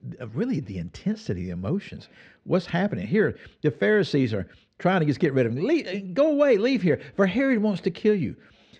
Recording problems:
muffled; slightly; fading above 2.5 kHz

